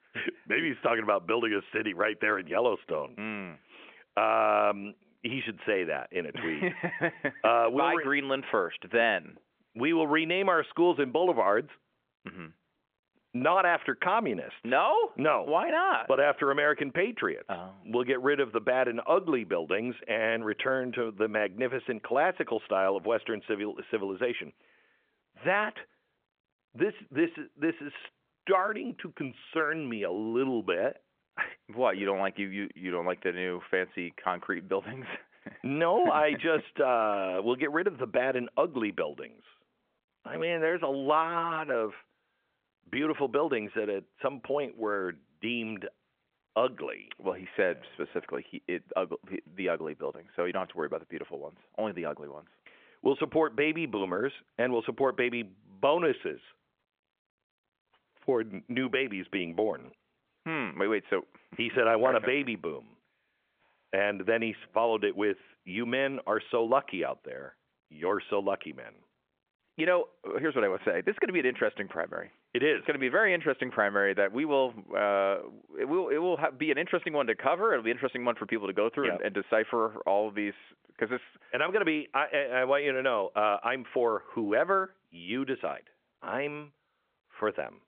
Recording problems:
phone-call audio; nothing above 3.5 kHz

